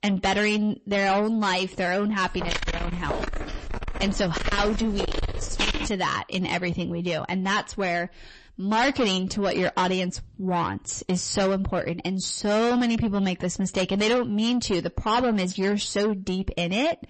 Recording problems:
distortion; heavy; 6 dB below the speech
garbled, watery; slightly; nothing above 8 kHz
footsteps; noticeable; from 2.5 to 6 s; peak 1 dB below the speech

